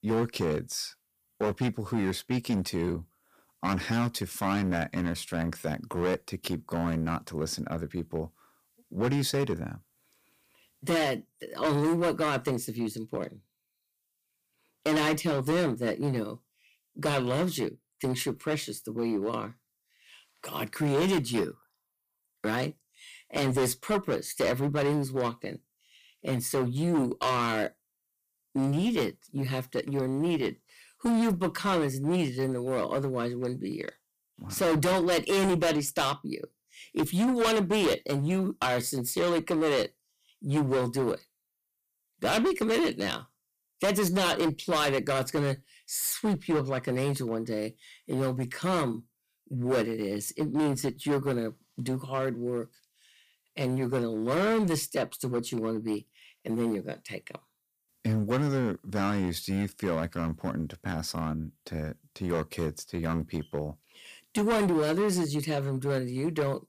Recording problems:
distortion; heavy; 10% of the sound clipped

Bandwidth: 15 kHz